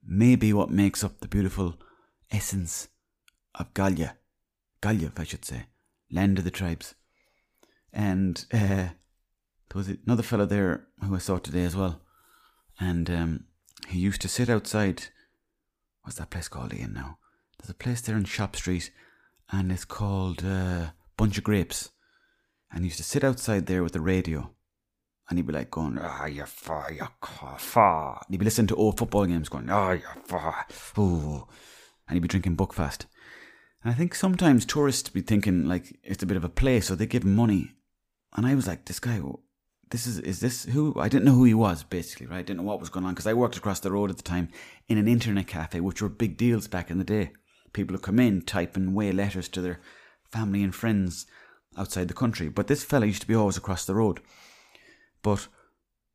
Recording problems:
none

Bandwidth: 15 kHz